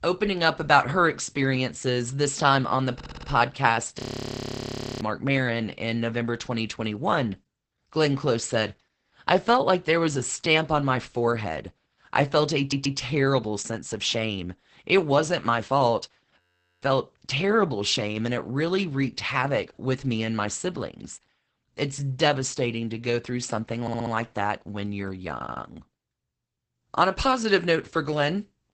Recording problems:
garbled, watery; badly; nothing above 8 kHz
audio stuttering; 4 times, first at 3 s
audio freezing; at 4 s for 1 s and at 16 s

